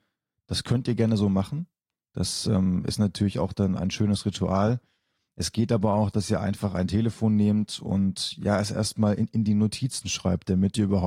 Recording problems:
garbled, watery; slightly; nothing above 15 kHz
abrupt cut into speech; at the end

